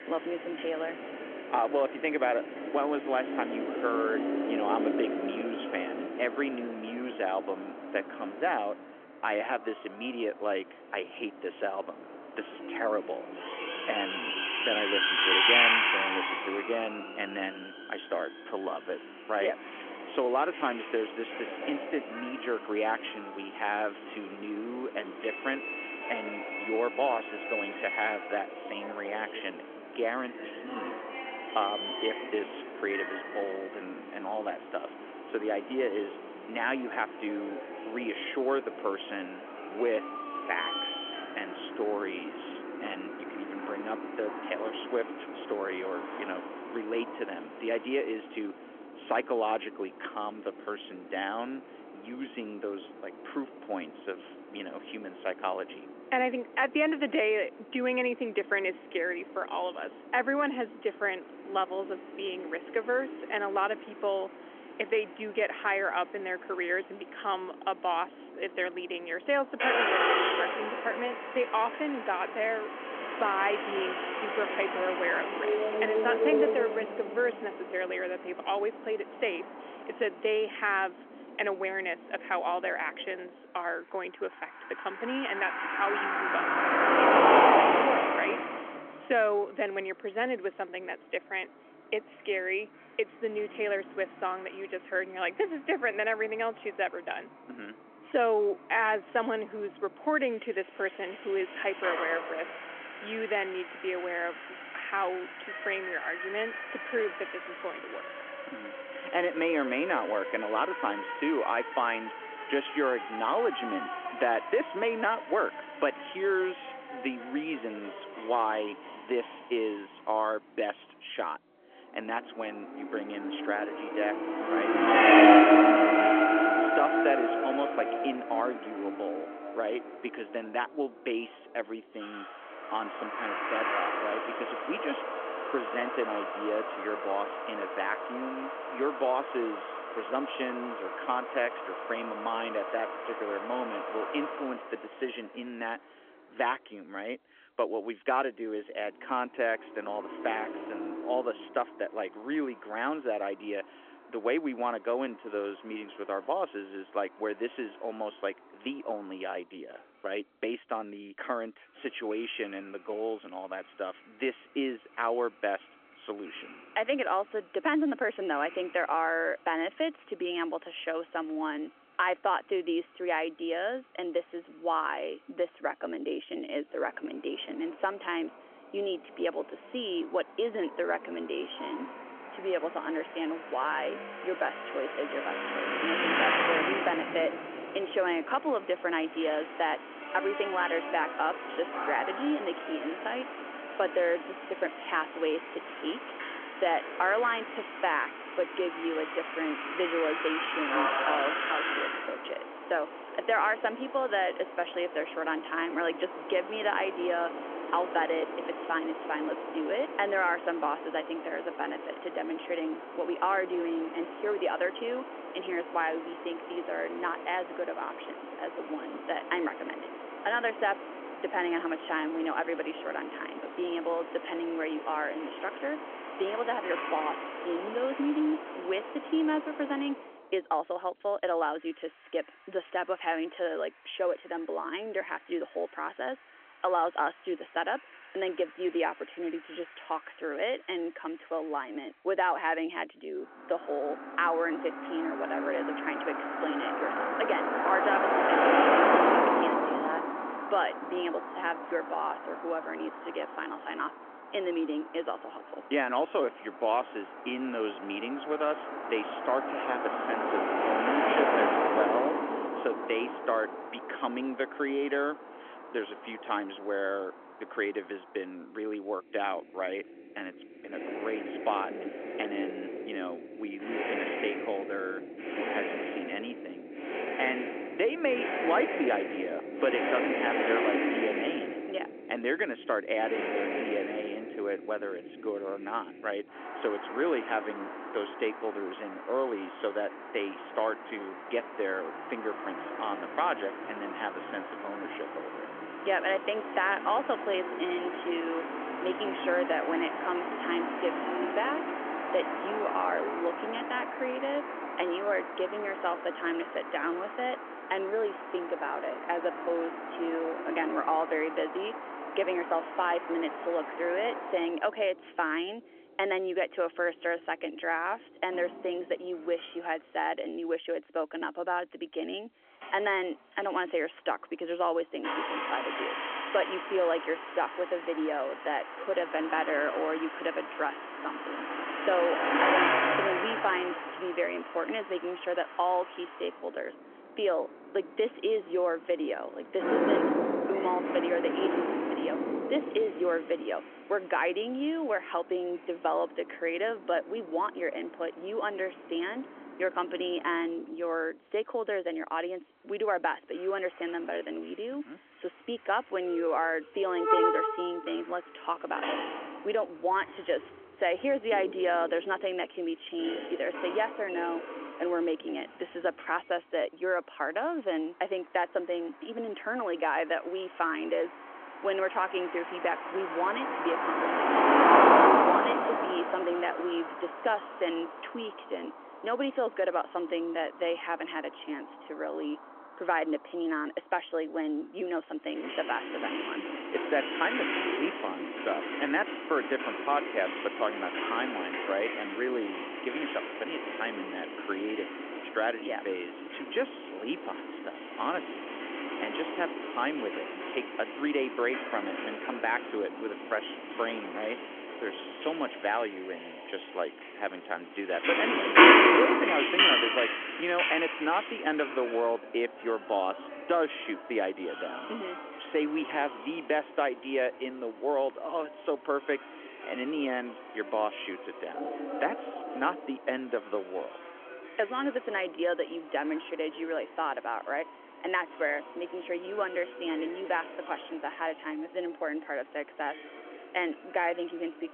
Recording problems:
phone-call audio; nothing above 3.5 kHz
traffic noise; very loud; throughout; 1 dB above the speech

